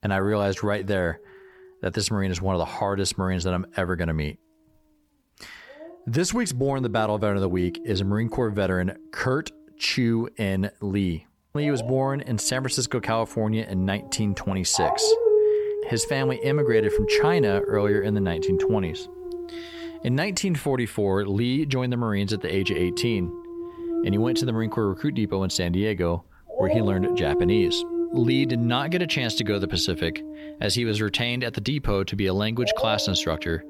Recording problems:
animal sounds; loud; throughout; 2 dB below the speech

